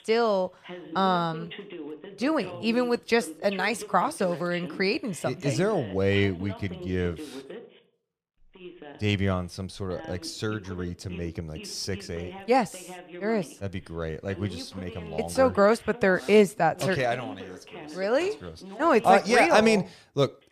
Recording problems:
voice in the background; noticeable; throughout; 15 dB below the speech

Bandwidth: 15 kHz